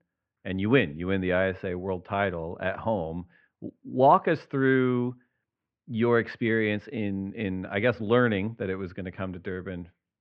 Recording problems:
muffled; very; fading above 2.5 kHz

